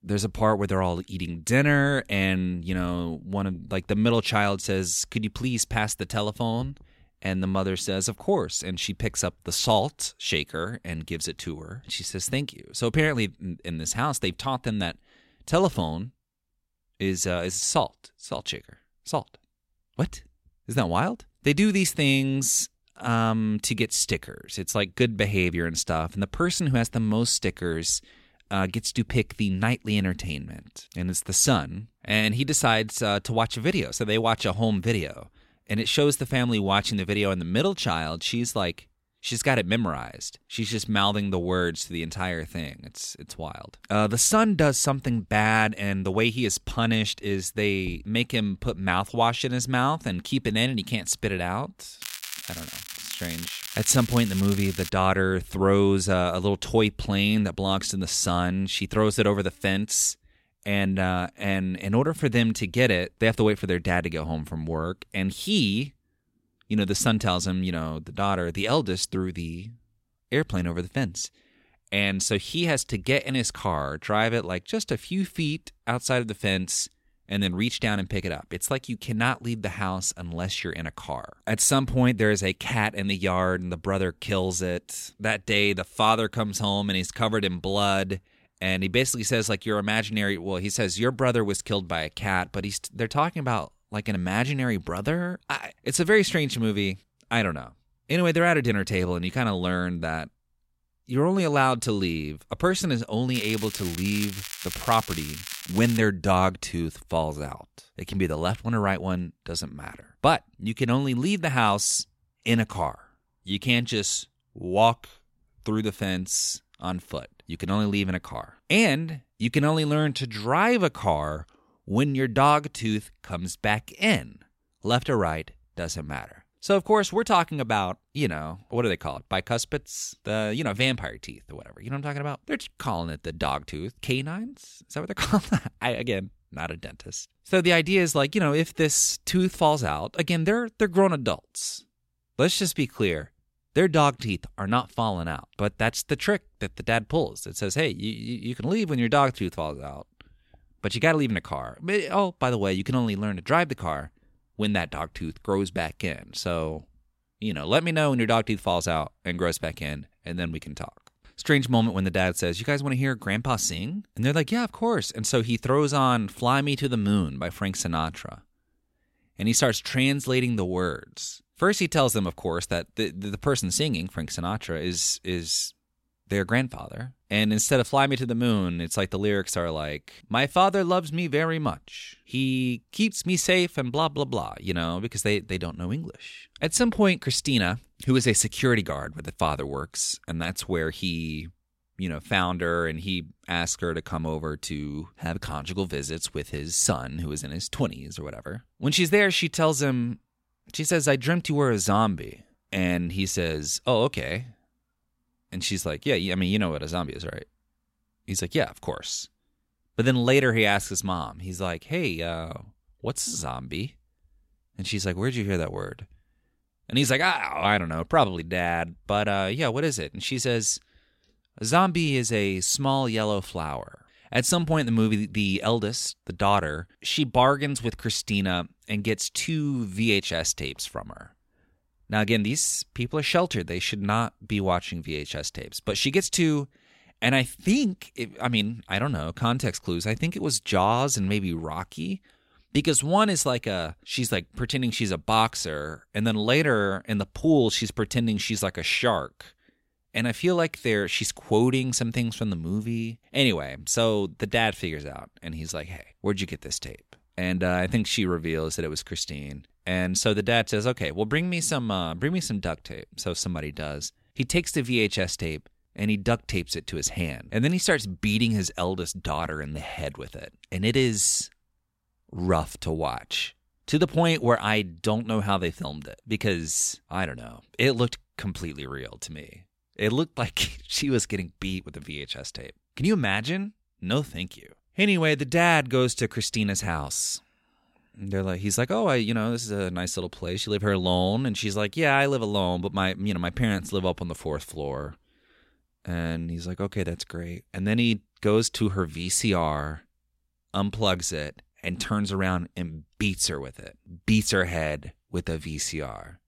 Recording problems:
crackling; loud; from 52 to 55 s and from 1:43 to 1:46; 10 dB below the speech

